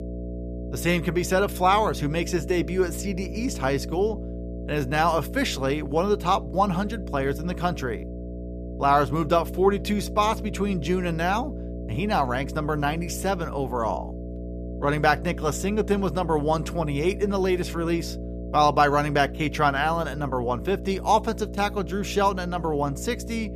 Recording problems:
electrical hum; noticeable; throughout; 60 Hz, 15 dB below the speech

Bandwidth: 14.5 kHz